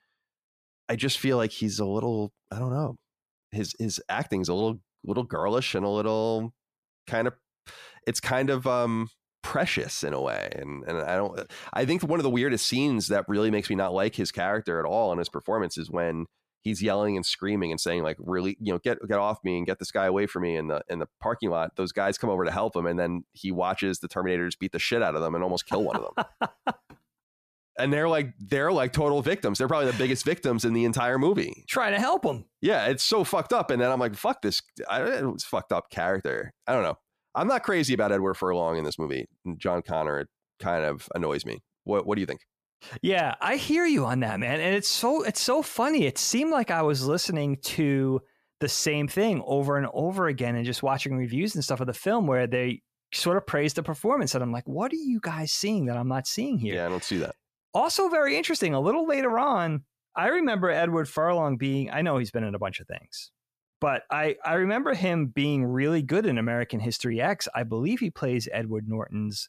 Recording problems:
none

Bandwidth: 14.5 kHz